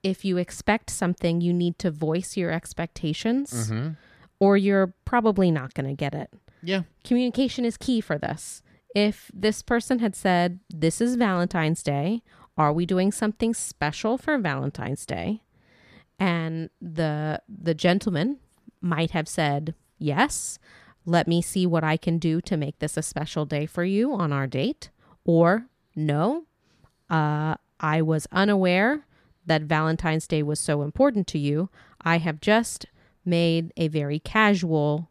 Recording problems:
none

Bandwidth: 14.5 kHz